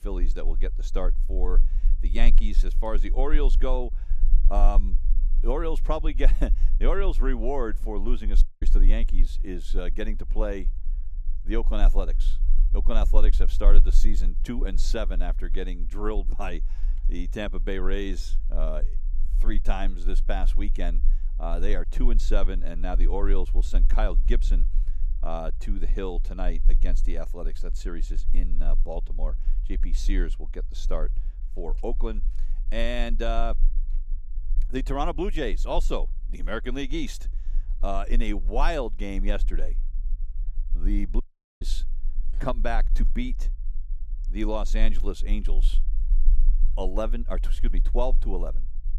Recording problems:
low rumble; faint; throughout; 20 dB below the speech
audio cutting out; at 8.5 s and at 41 s

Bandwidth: 15.5 kHz